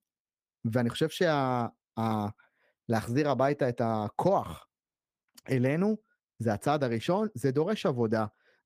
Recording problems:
none

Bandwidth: 15 kHz